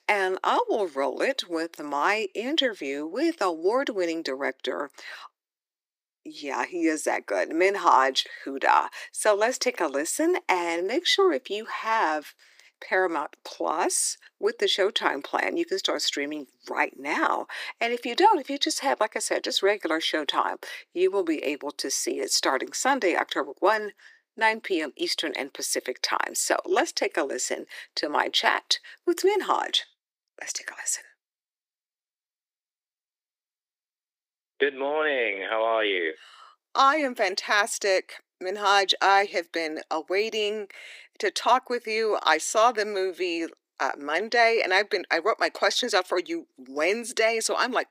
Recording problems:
thin; very; fading below 350 Hz

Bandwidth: 15 kHz